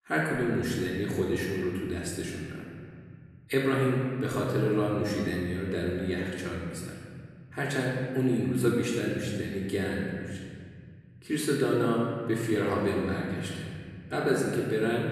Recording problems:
off-mic speech; far
room echo; noticeable; dies away in 2.2 s

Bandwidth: 13.5 kHz